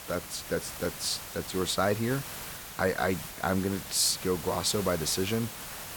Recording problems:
hiss; loud; throughout; 9 dB below the speech

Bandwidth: 18 kHz